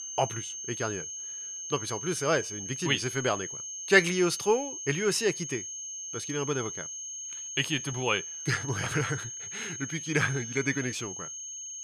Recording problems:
high-pitched whine; loud; throughout; 6.5 kHz, 6 dB below the speech

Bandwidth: 14 kHz